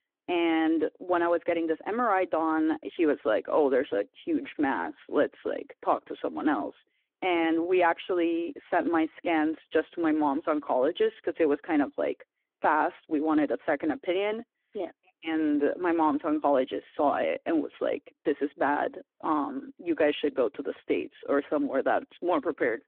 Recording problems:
phone-call audio

